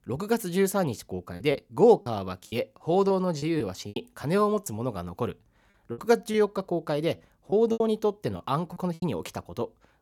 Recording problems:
choppy; very; 9% of the speech affected

